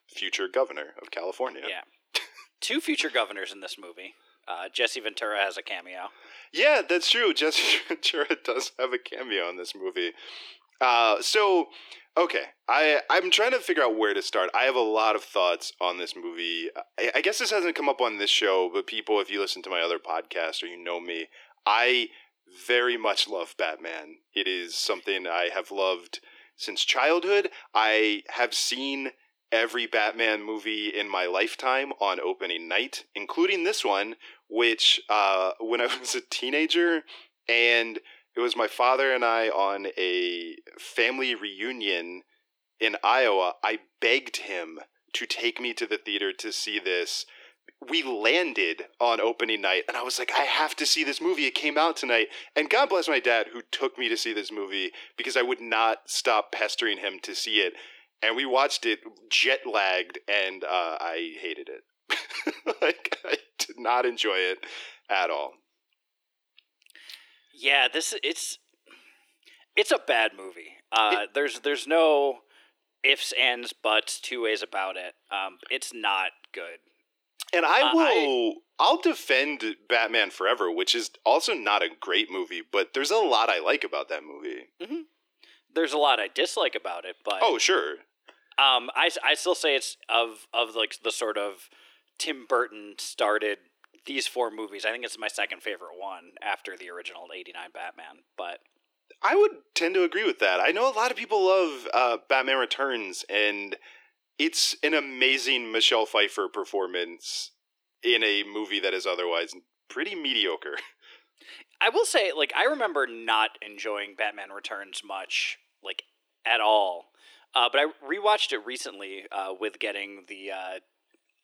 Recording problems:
thin; very; fading below 300 Hz

